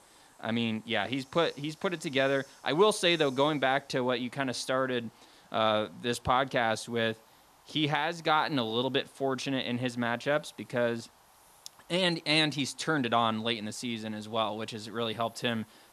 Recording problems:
hiss; faint; throughout; 30 dB below the speech

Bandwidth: 13.5 kHz